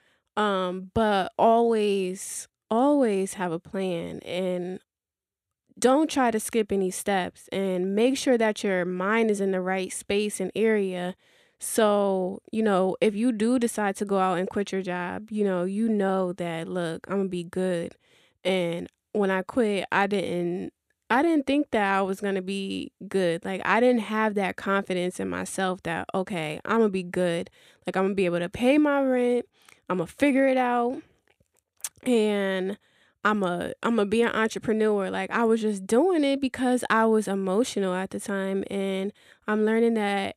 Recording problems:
none

